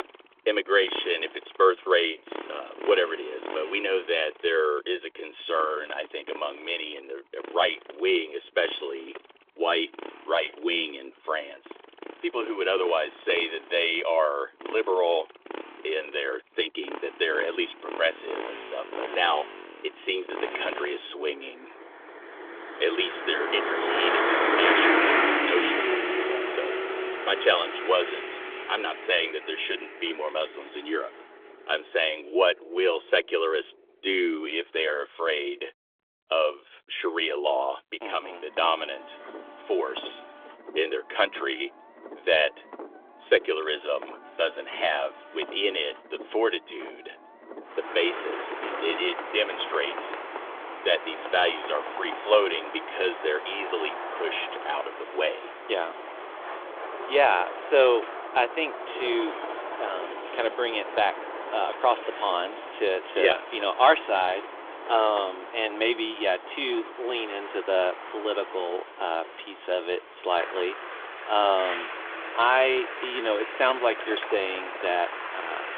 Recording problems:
phone-call audio; nothing above 3.5 kHz
traffic noise; loud; throughout; 5 dB below the speech

